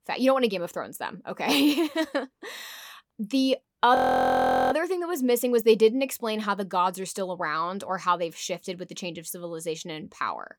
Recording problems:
audio freezing; at 4 s for 1 s

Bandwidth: 18.5 kHz